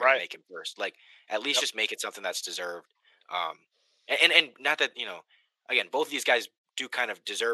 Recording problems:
thin; very; fading below 500 Hz
abrupt cut into speech; at the start and the end

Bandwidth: 15 kHz